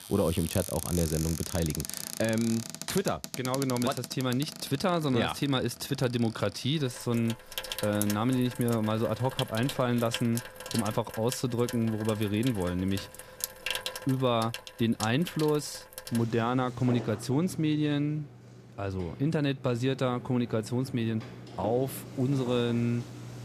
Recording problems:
household noises; loud; throughout; 10 dB below the speech

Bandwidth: 14.5 kHz